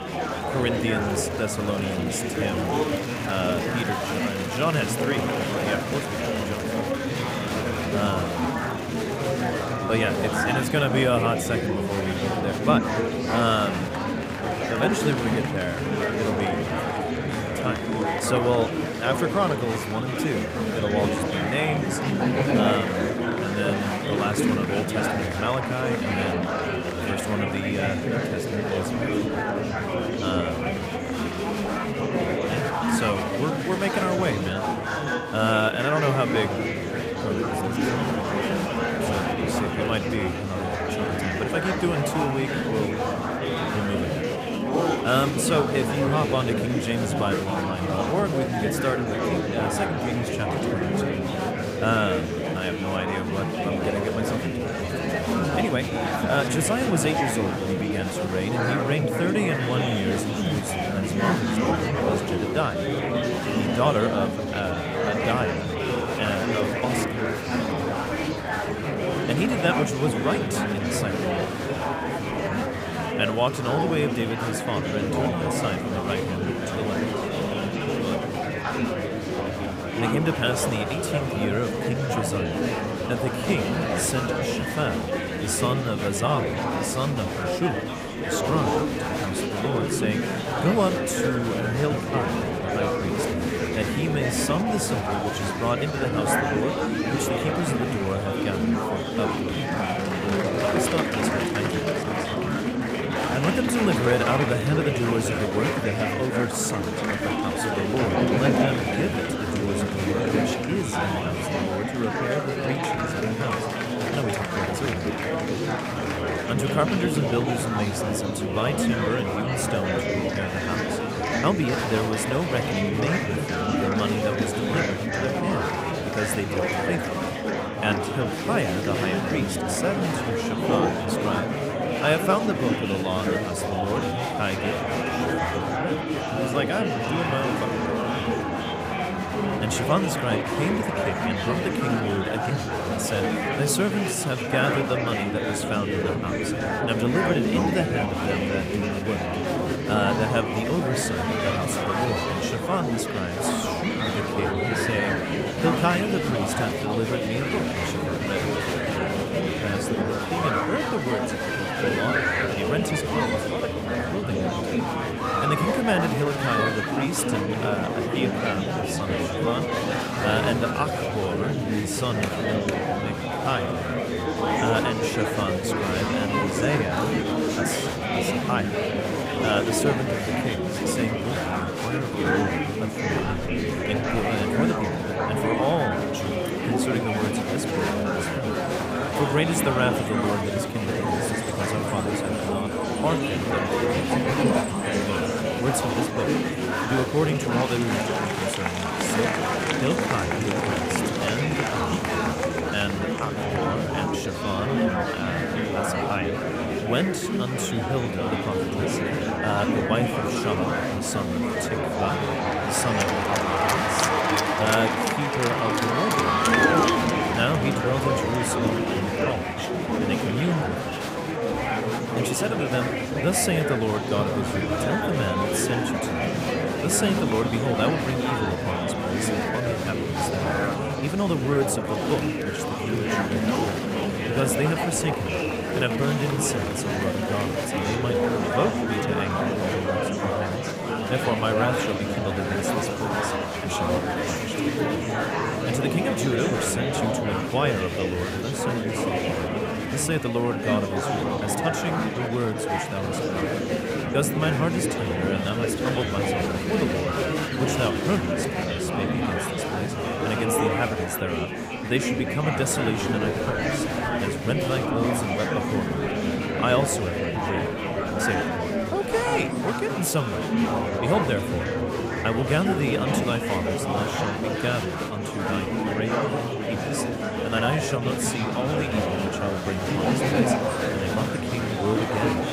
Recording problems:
murmuring crowd; very loud; throughout; 3 dB above the speech

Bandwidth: 15.5 kHz